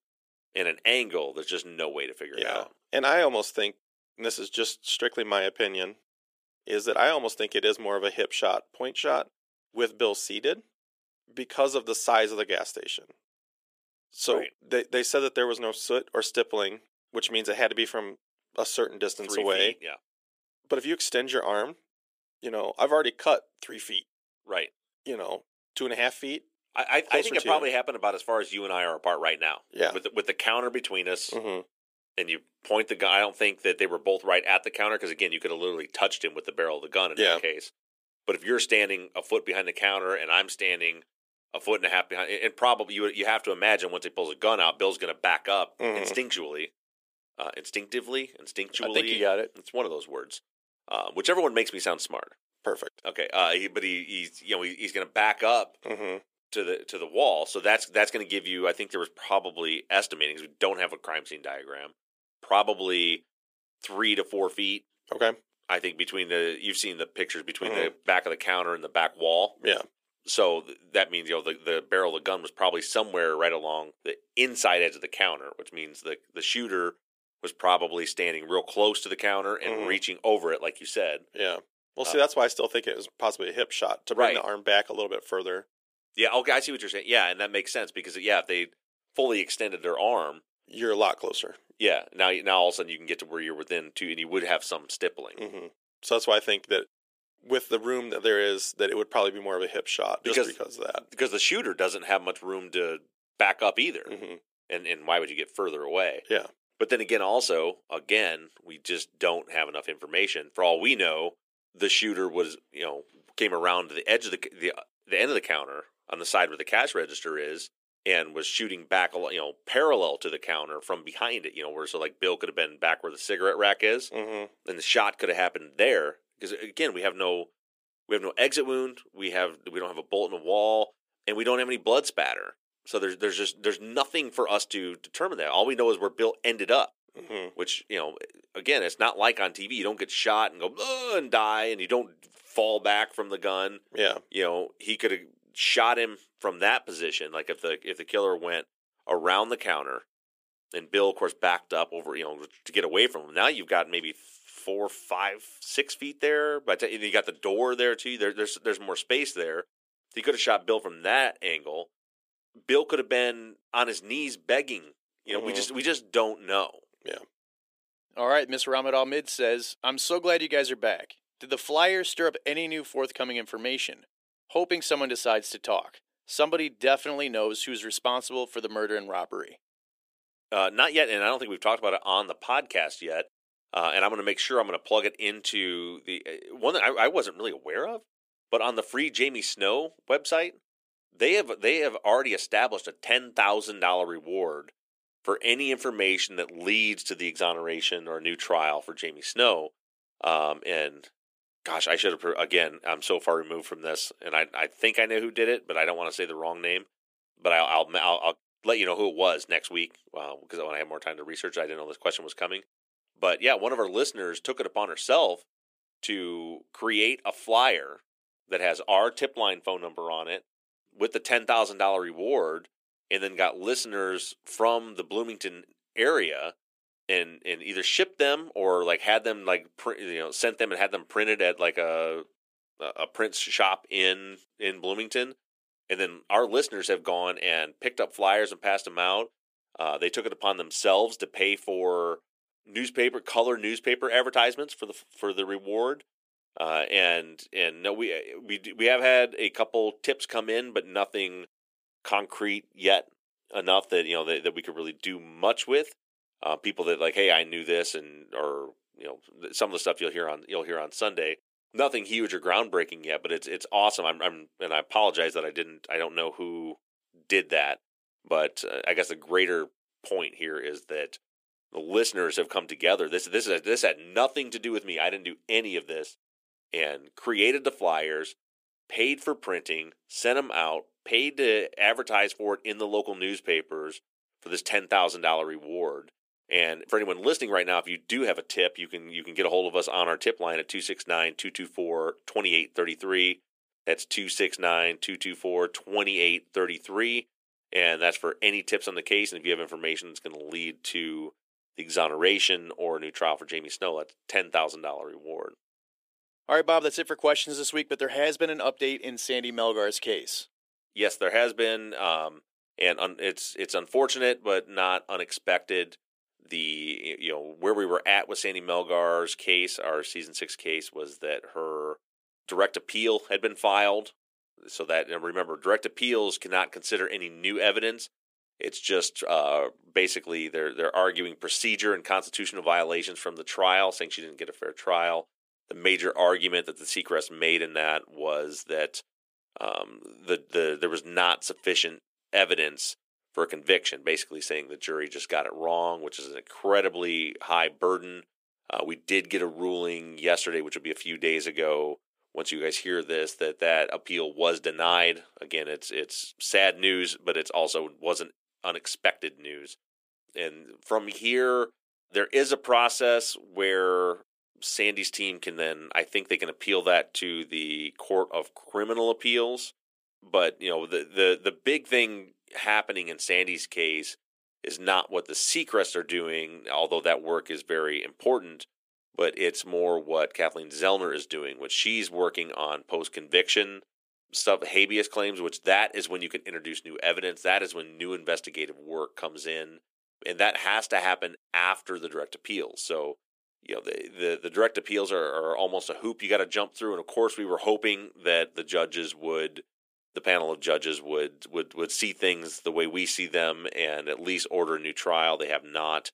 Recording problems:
thin; very; fading below 350 Hz

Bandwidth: 15 kHz